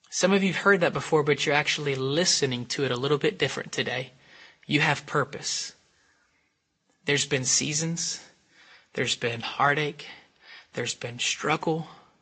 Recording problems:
high frequencies cut off; noticeable; nothing above 7.5 kHz
garbled, watery; slightly

